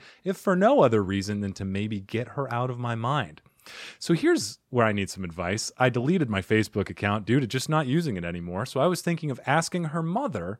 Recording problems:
none

